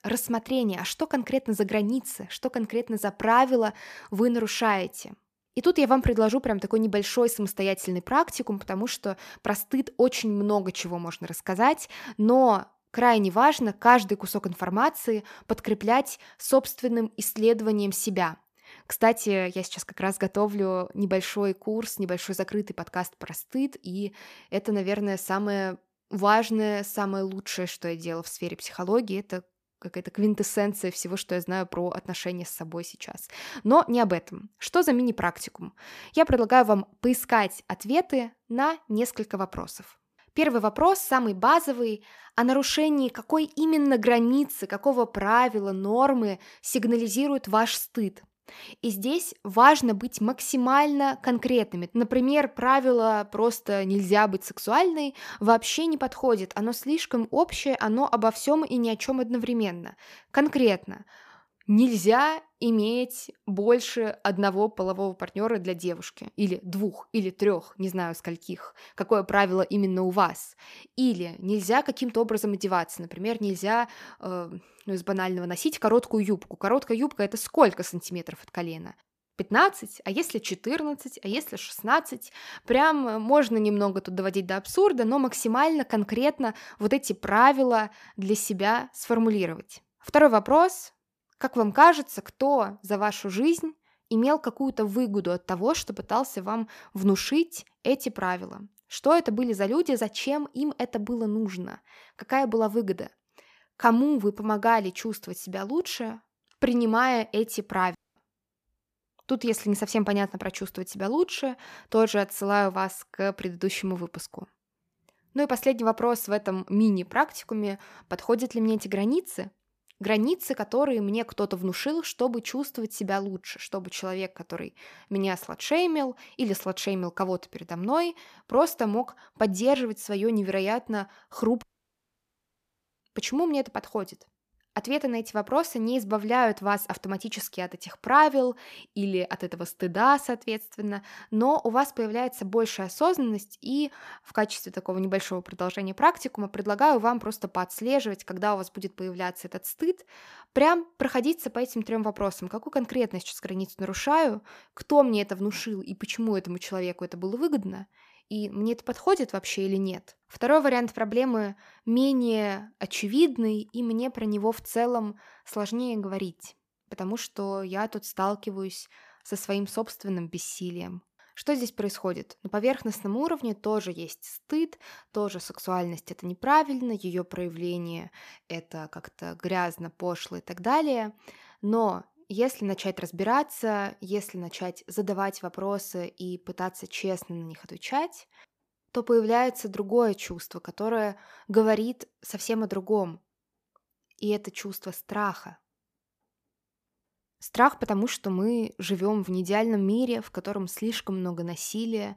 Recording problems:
audio cutting out; at 1:48 and at 2:12 for 1.5 s

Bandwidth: 14.5 kHz